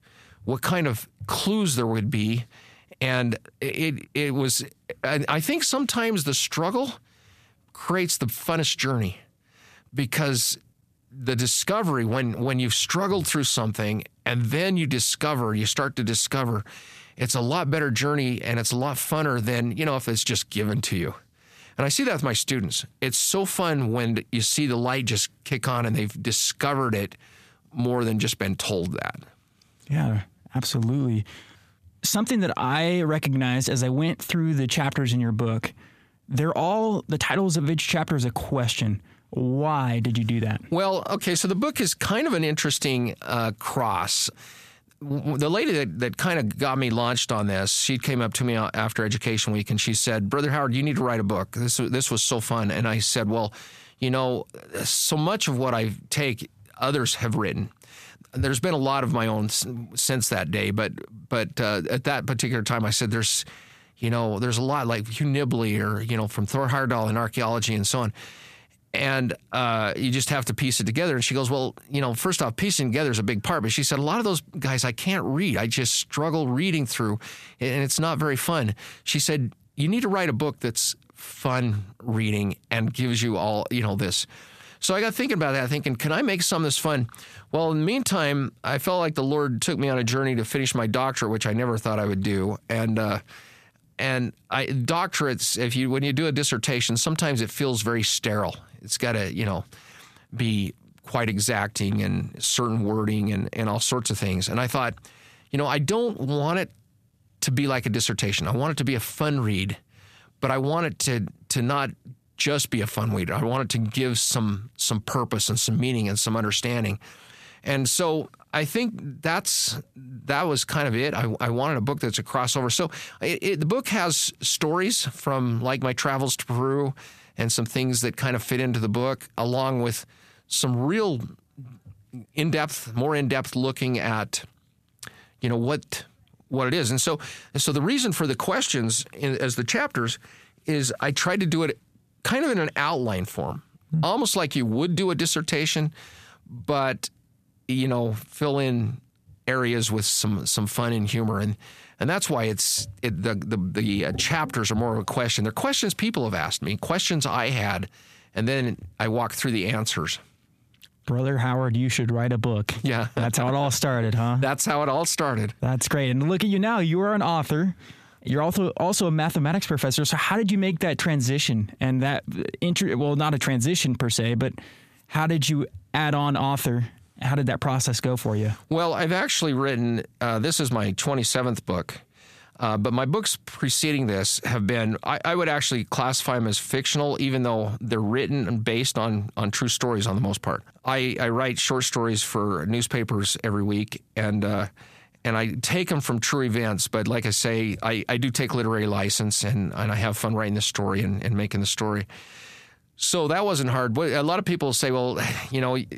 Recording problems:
squashed, flat; heavily

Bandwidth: 14.5 kHz